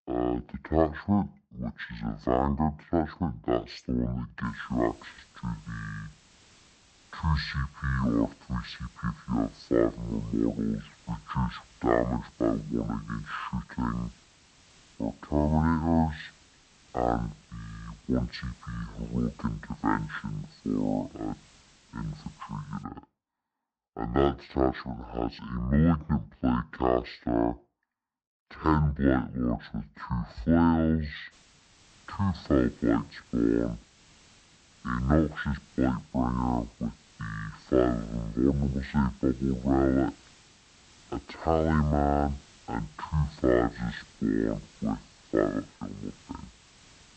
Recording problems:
wrong speed and pitch; too slow and too low; 0.5 times normal speed
high frequencies cut off; slight; nothing above 8 kHz
hiss; faint; from 4.5 to 23 s and from 31 s on; 25 dB below the speech

